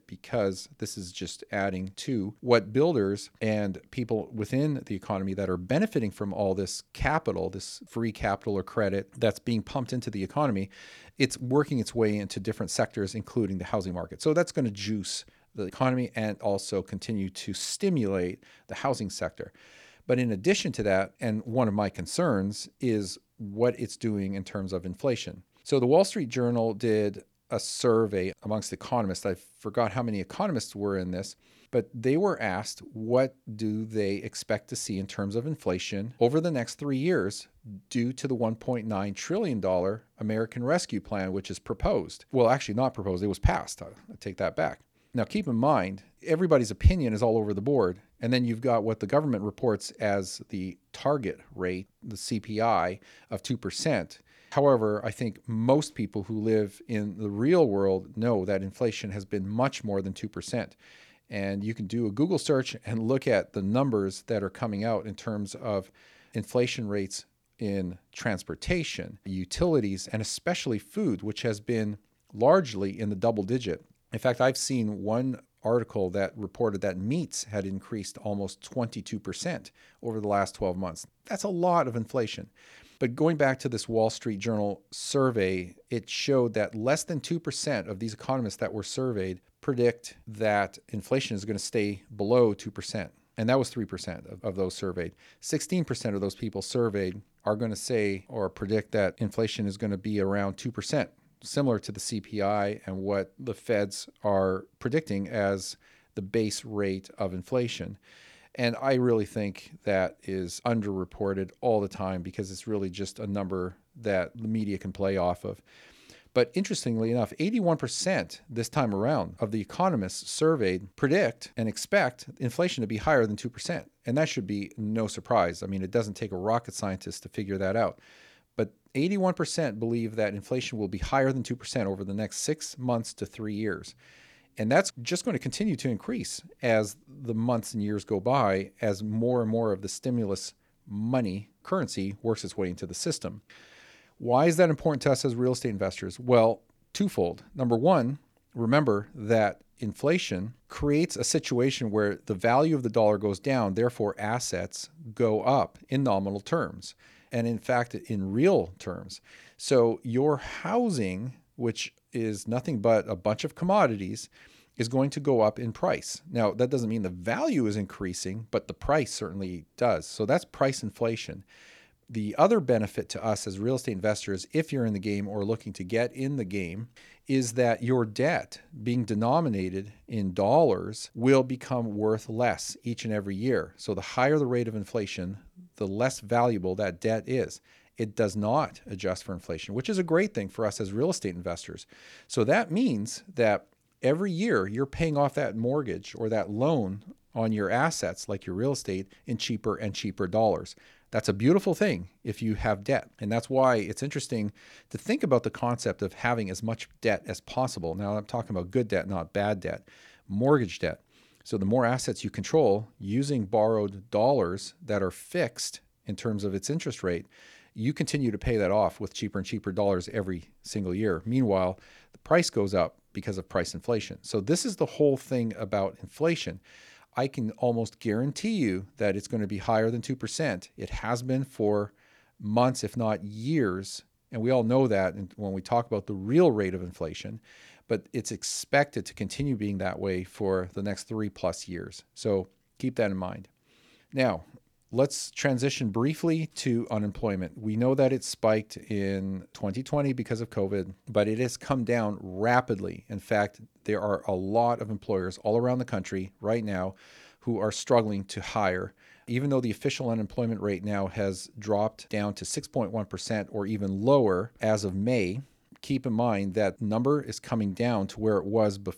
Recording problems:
none

